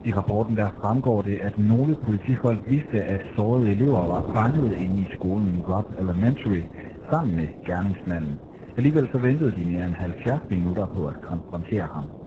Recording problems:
garbled, watery; badly; nothing above 7.5 kHz
wind noise on the microphone; occasional gusts; 15 dB below the speech

